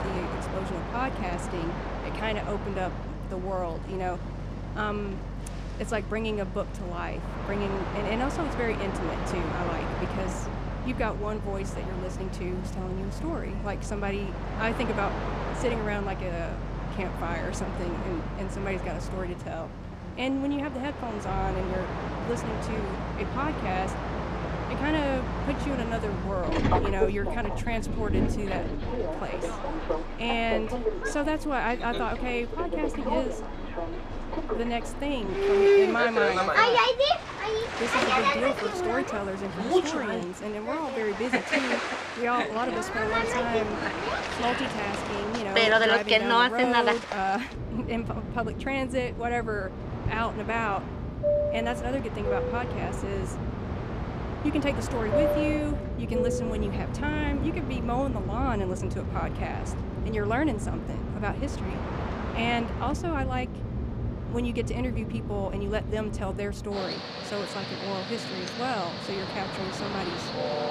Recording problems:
train or aircraft noise; very loud; throughout; 2 dB above the speech

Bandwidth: 14.5 kHz